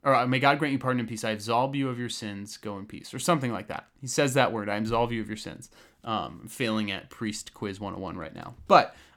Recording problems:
none

